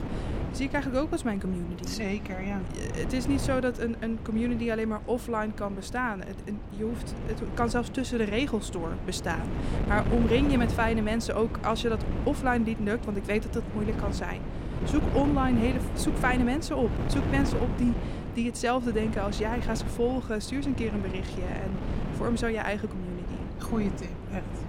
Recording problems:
wind noise on the microphone; heavy; 9 dB below the speech

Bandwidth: 16.5 kHz